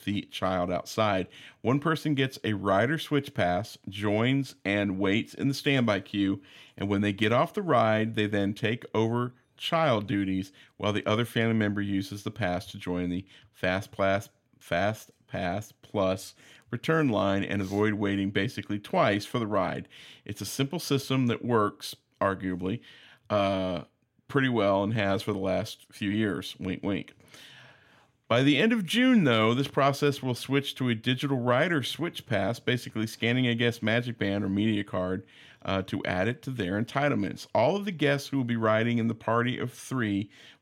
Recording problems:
none

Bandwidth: 16 kHz